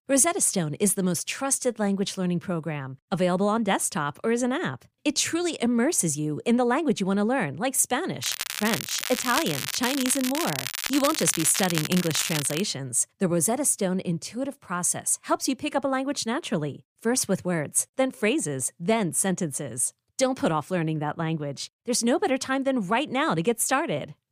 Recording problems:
crackling; loud; from 8 to 13 s; 4 dB below the speech

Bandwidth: 15 kHz